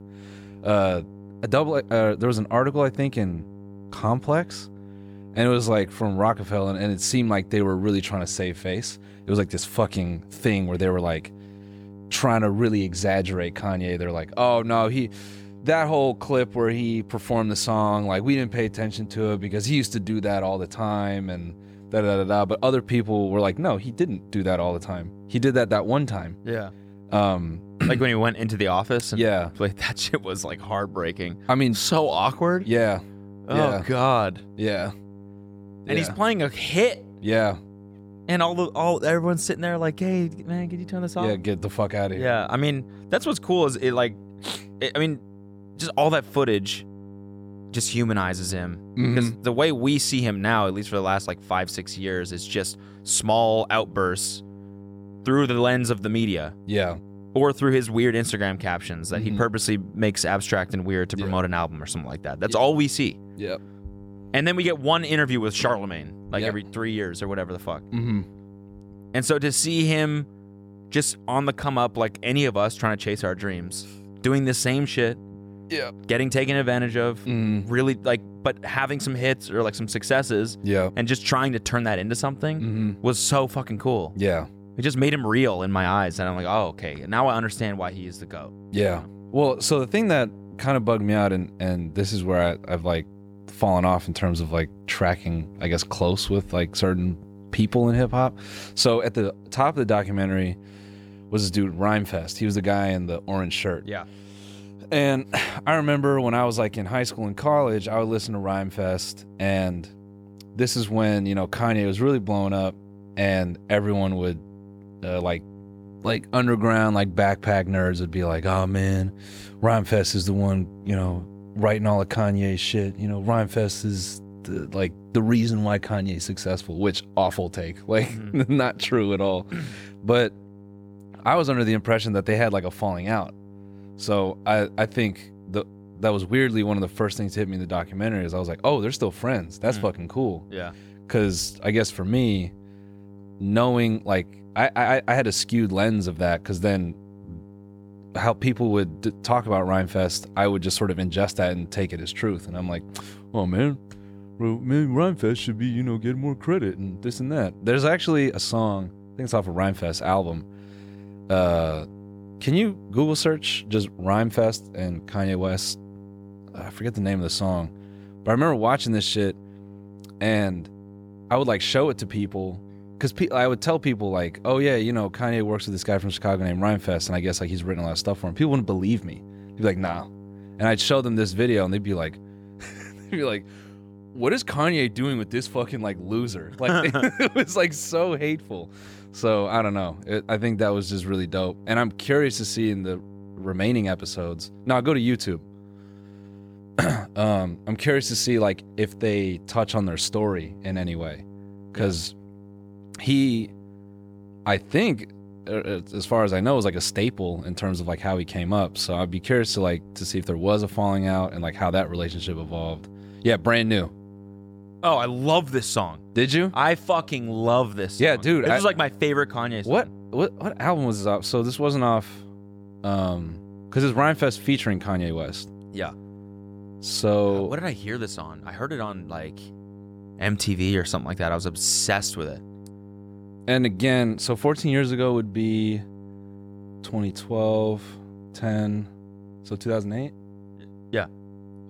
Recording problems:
electrical hum; faint; throughout; 50 Hz, 25 dB below the speech

